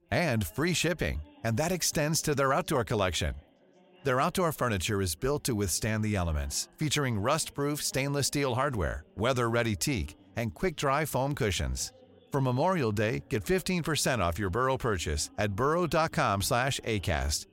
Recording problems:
background chatter; faint; throughout; 3 voices, 30 dB below the speech

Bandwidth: 16 kHz